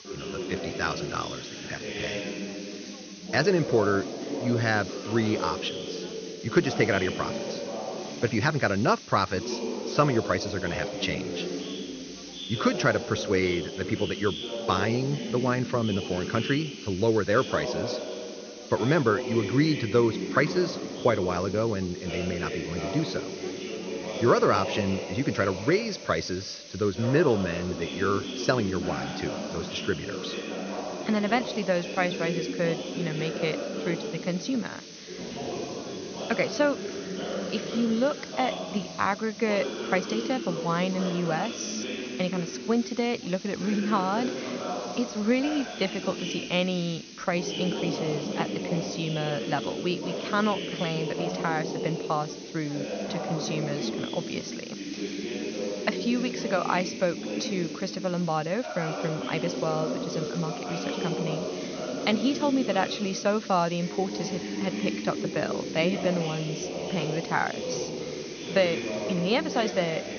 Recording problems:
high frequencies cut off; noticeable; nothing above 6.5 kHz
background chatter; loud; throughout; 2 voices, 6 dB below the speech
hiss; noticeable; throughout; 15 dB below the speech

